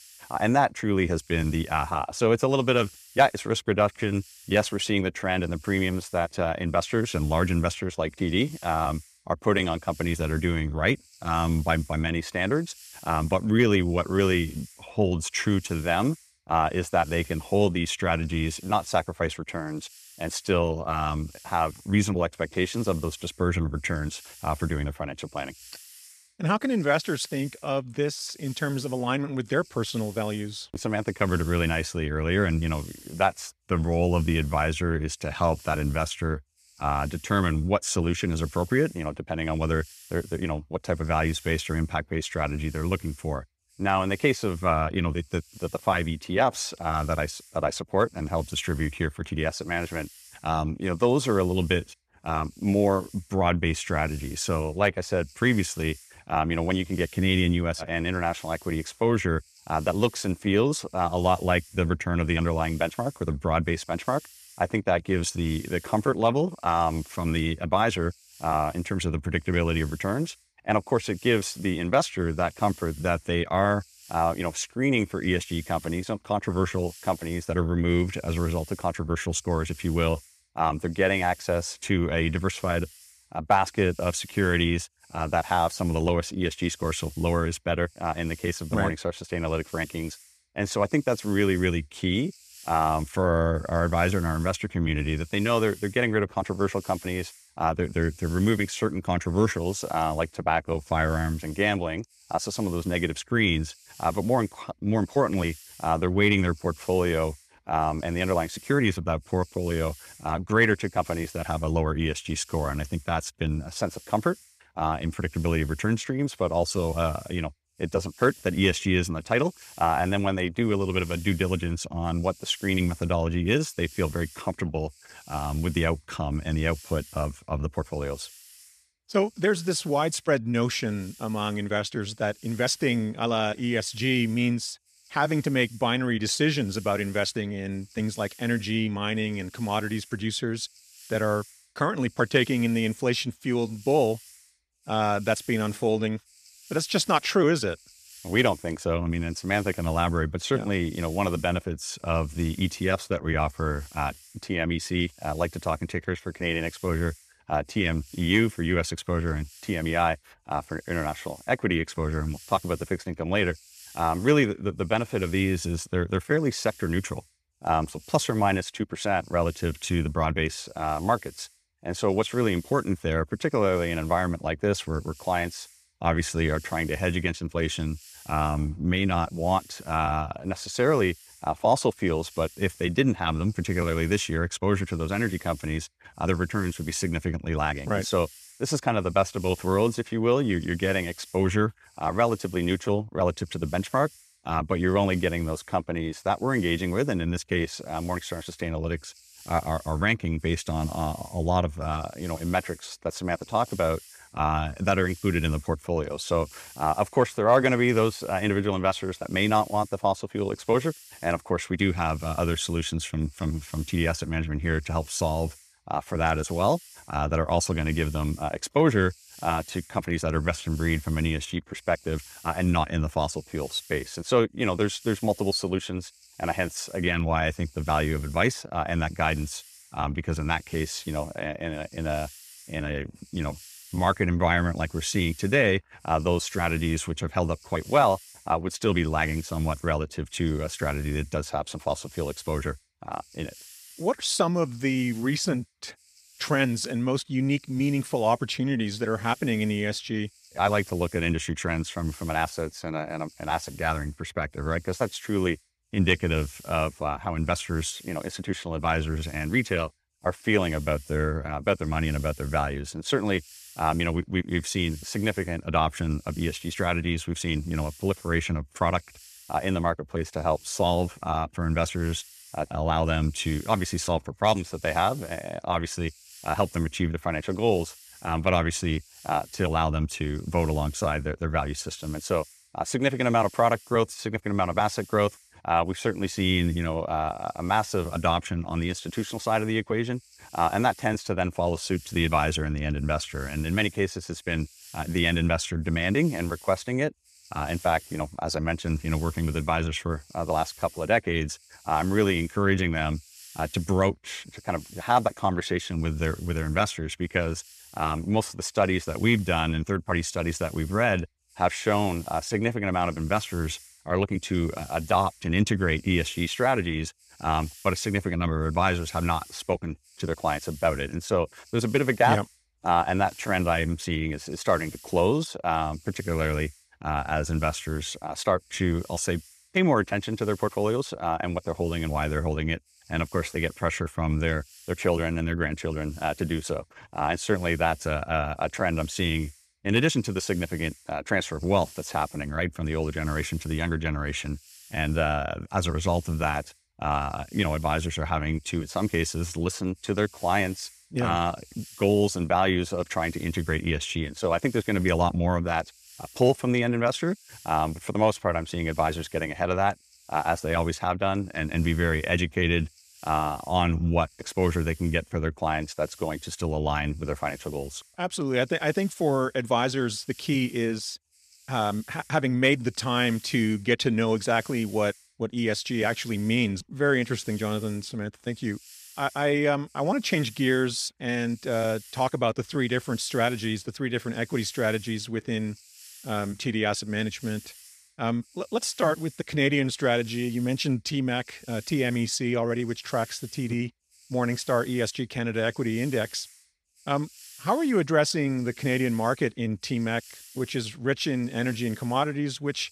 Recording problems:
hiss; faint; throughout; 20 dB below the speech

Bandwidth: 14.5 kHz